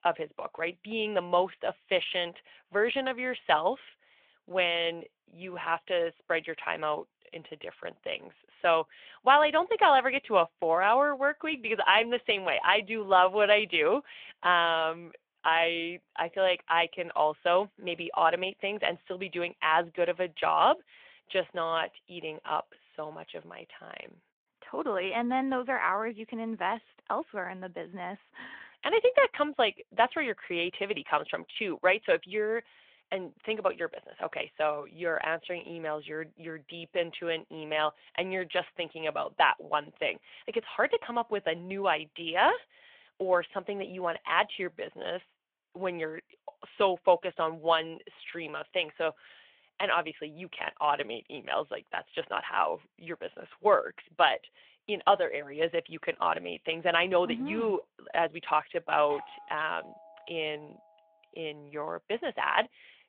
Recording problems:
phone-call audio
doorbell; faint; from 59 s to 1:00; peak 15 dB below the speech

